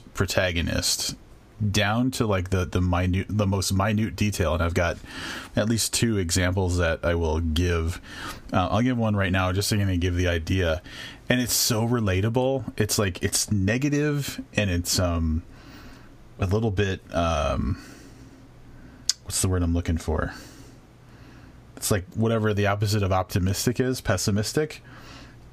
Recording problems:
squashed, flat; somewhat

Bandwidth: 15 kHz